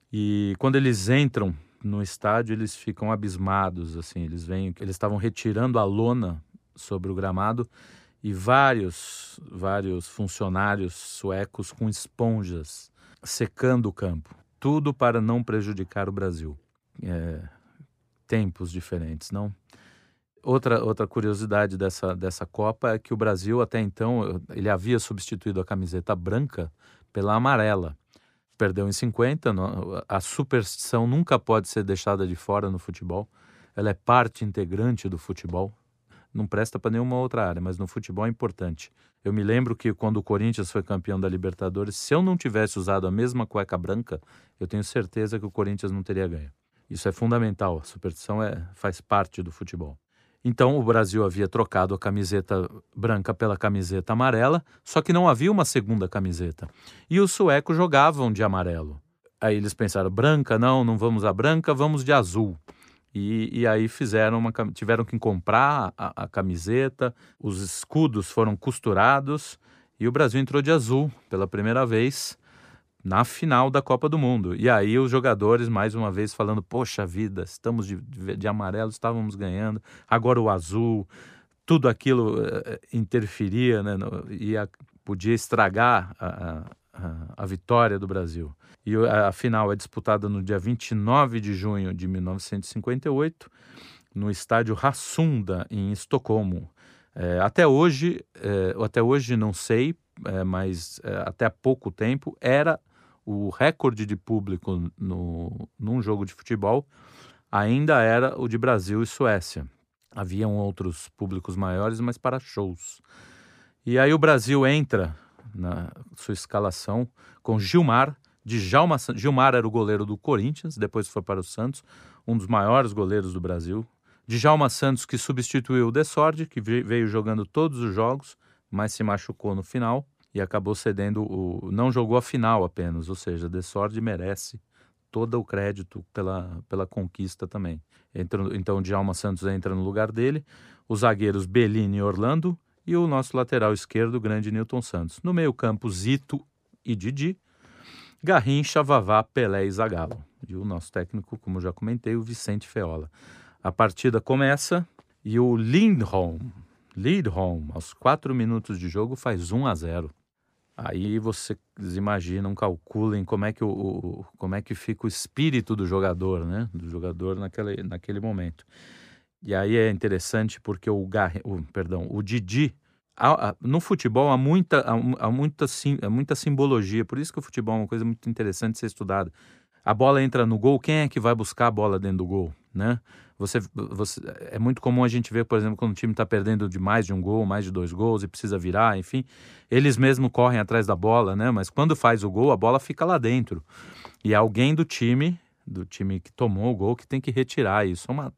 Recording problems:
none

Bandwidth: 15 kHz